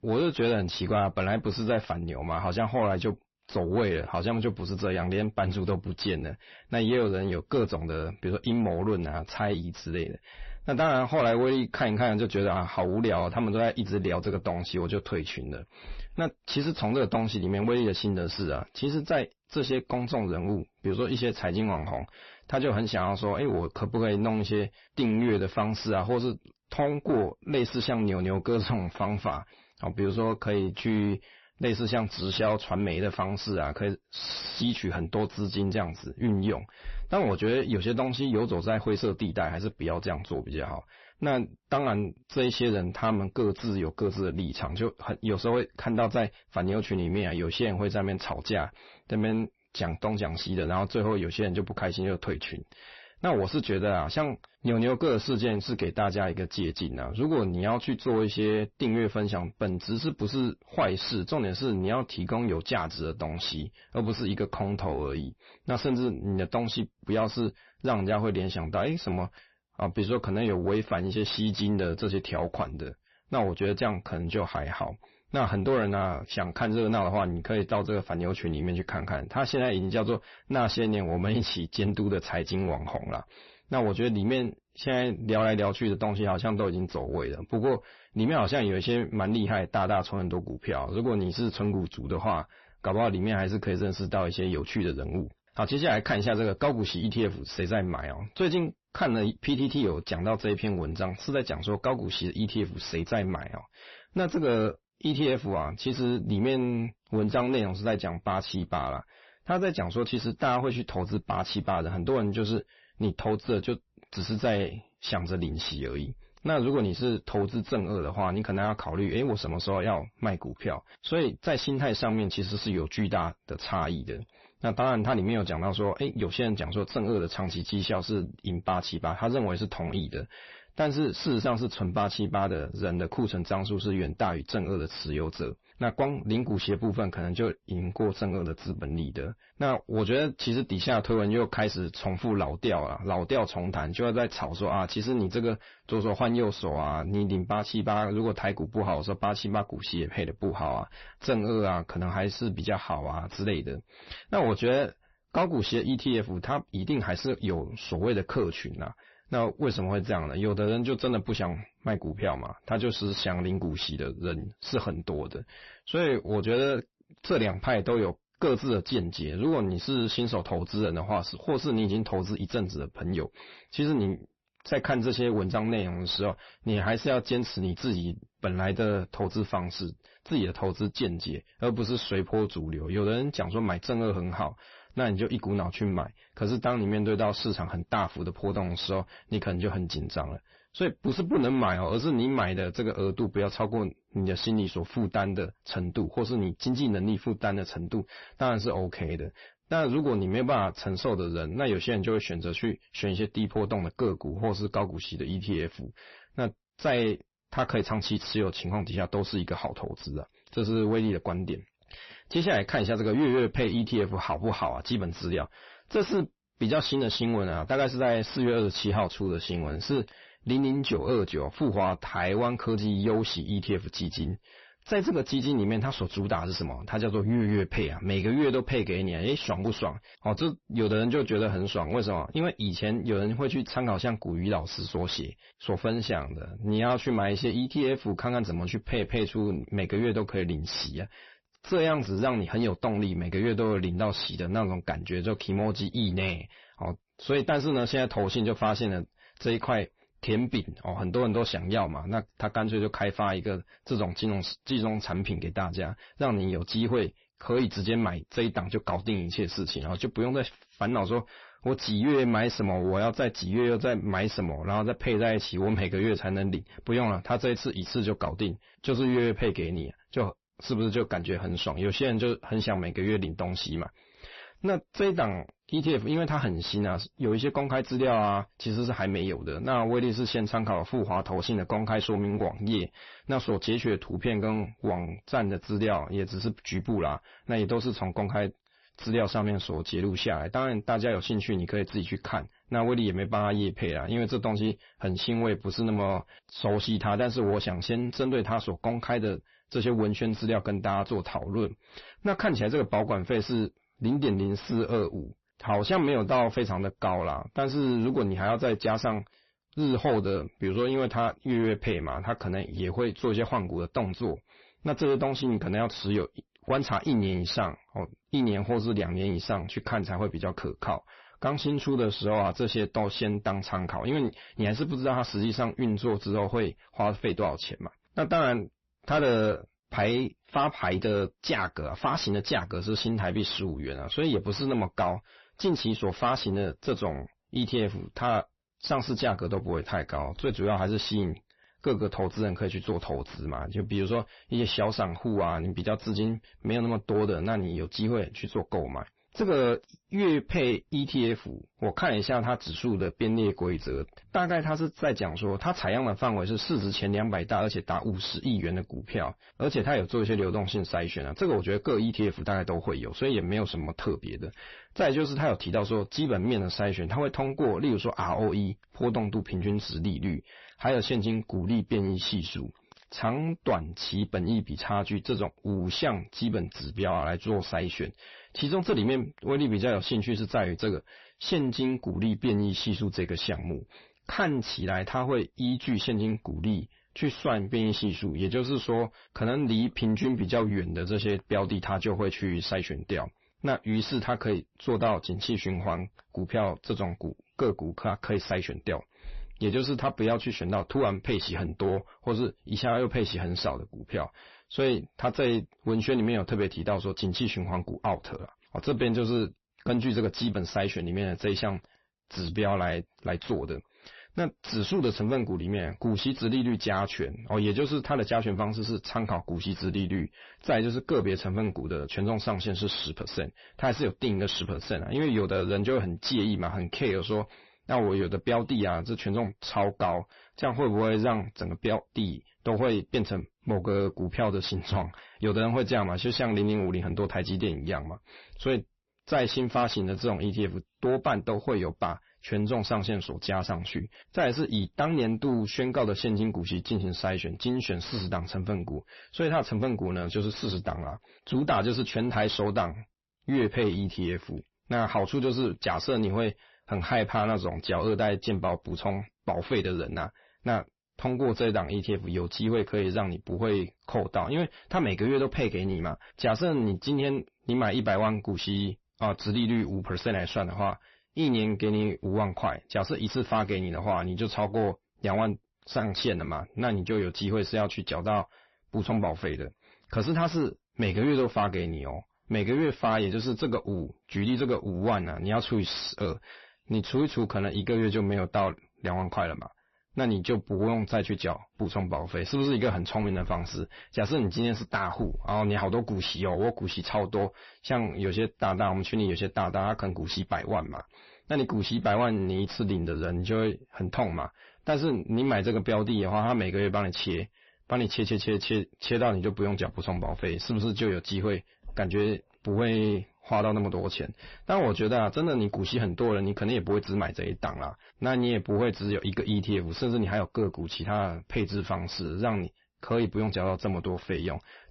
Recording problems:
distortion; slight; 10 dB below the speech
garbled, watery; slightly; nothing above 5.5 kHz

